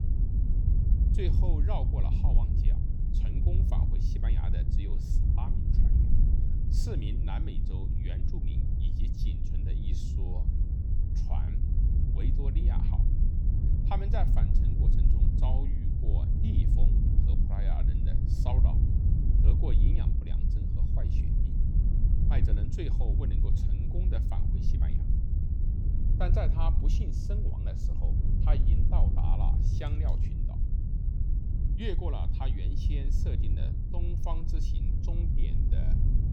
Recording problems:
wind noise on the microphone; heavy; 1 dB below the speech

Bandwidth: 18 kHz